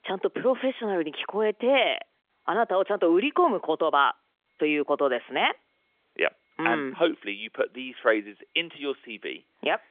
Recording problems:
phone-call audio; nothing above 3.5 kHz

